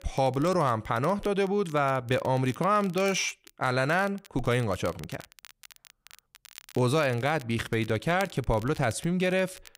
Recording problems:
crackle, like an old record; faint; 20 dB below the speech

